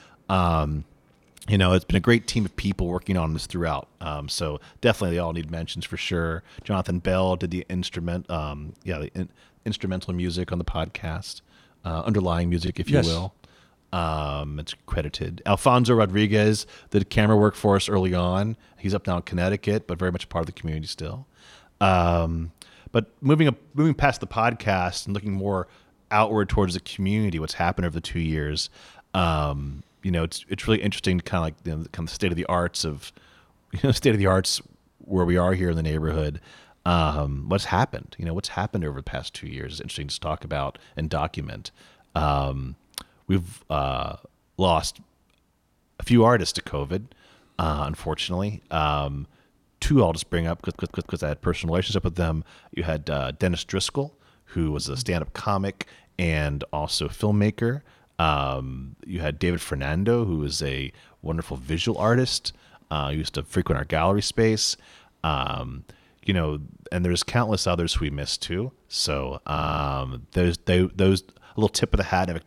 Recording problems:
audio stuttering; at 51 s and at 1:10

